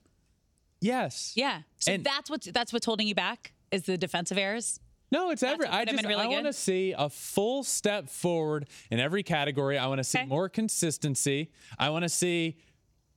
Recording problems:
squashed, flat; somewhat

